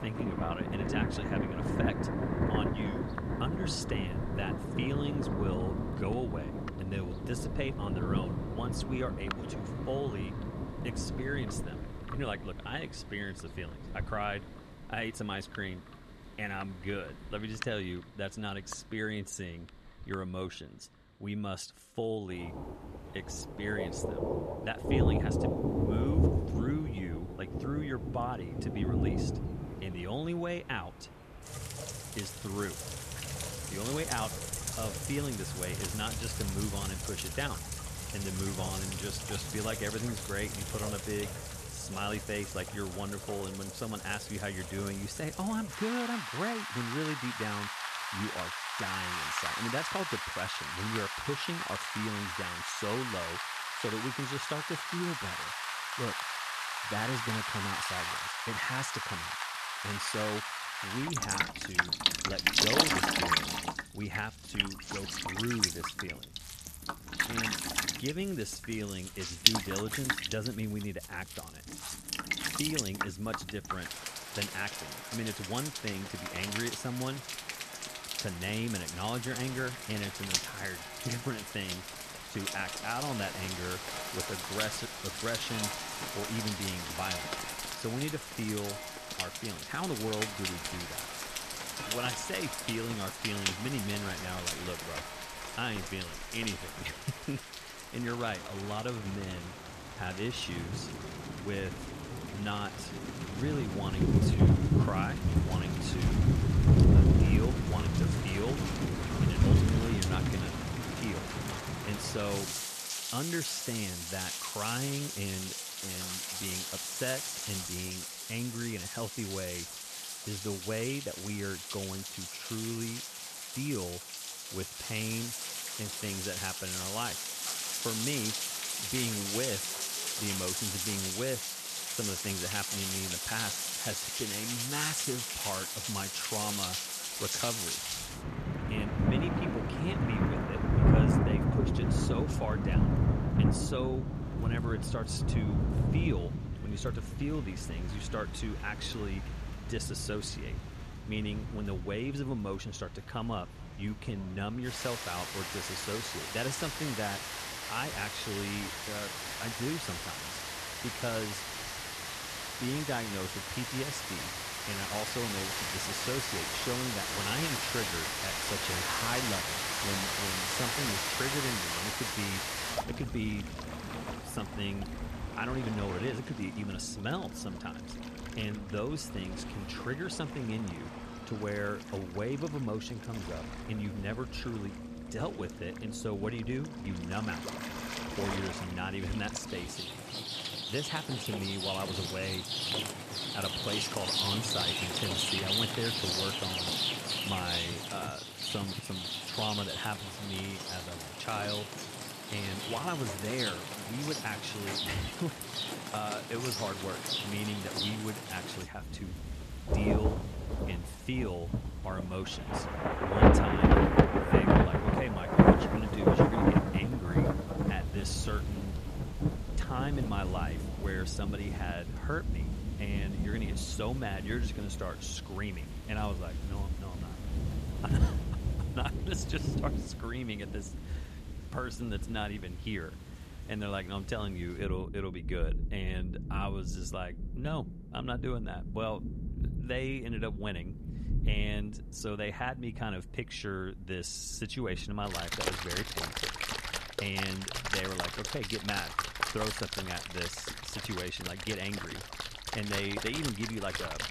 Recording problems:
rain or running water; very loud; throughout; 4 dB above the speech

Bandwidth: 14 kHz